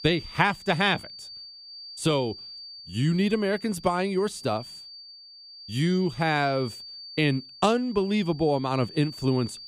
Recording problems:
high-pitched whine; noticeable; throughout; 4.5 kHz, 15 dB below the speech

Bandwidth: 15 kHz